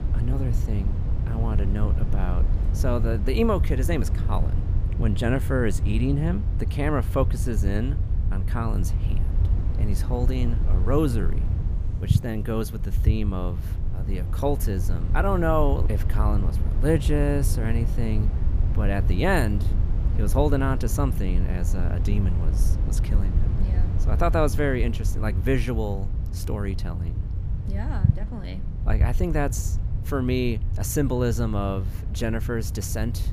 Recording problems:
low rumble; noticeable; throughout; 10 dB below the speech

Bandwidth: 15 kHz